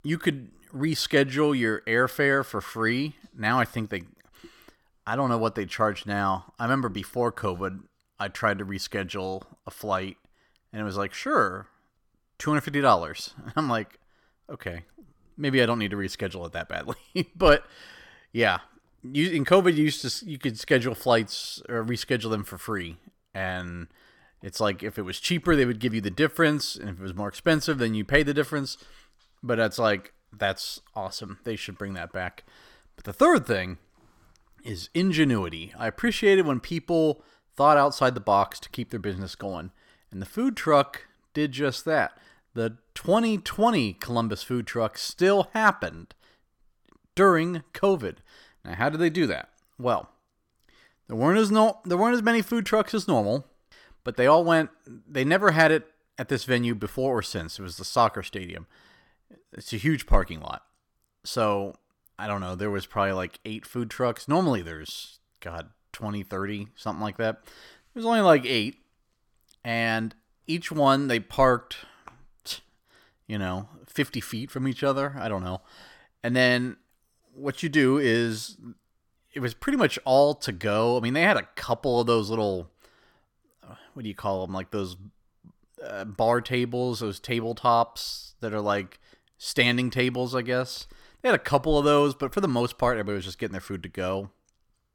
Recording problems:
none

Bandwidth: 18 kHz